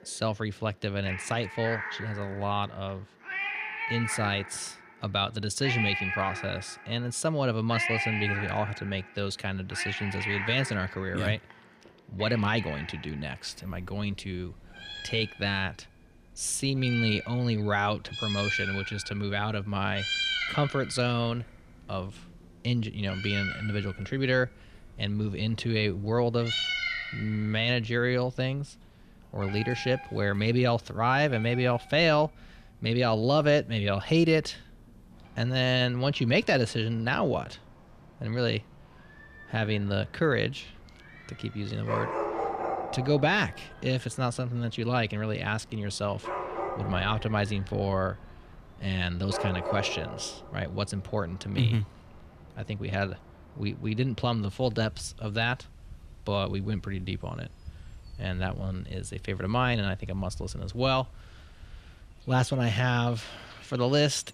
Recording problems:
animal sounds; loud; throughout; 5 dB below the speech

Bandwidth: 14.5 kHz